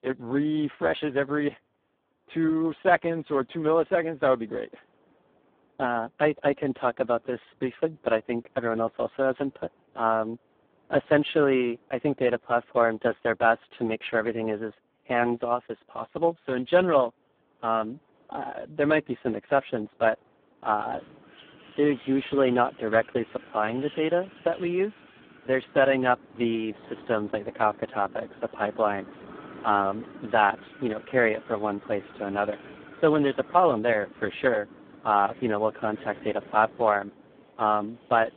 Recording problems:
phone-call audio; poor line
wind in the background; faint; throughout; 20 dB below the speech

